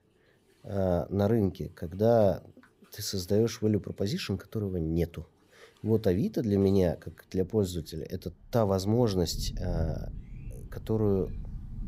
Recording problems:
rain or running water; noticeable; throughout; 10 dB below the speech

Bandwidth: 15.5 kHz